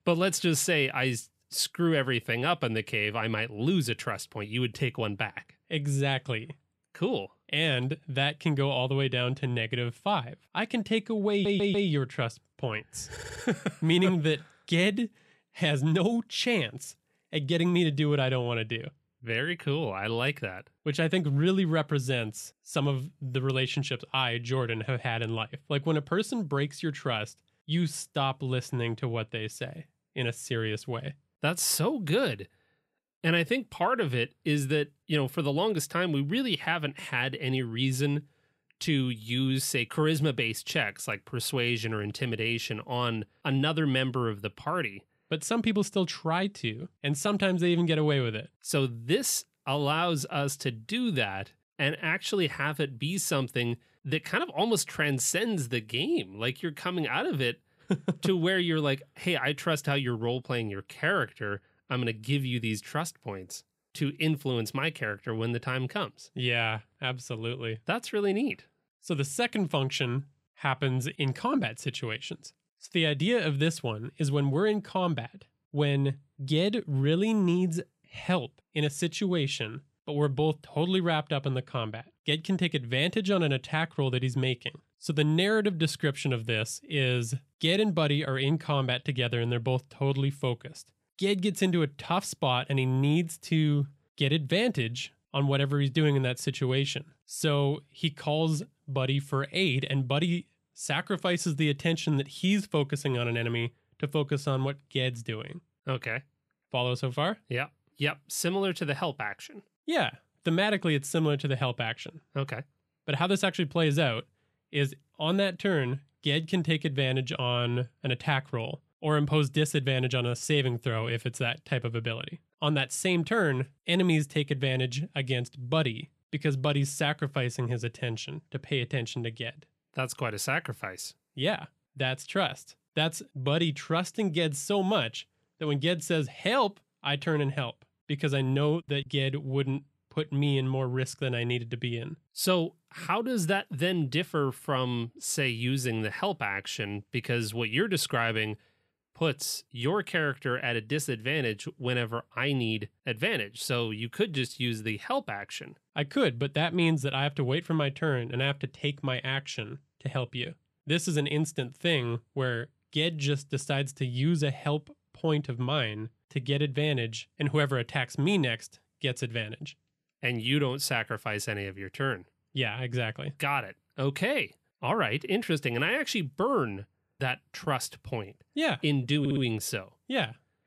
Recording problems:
audio stuttering; at 11 s, at 13 s and at 2:59

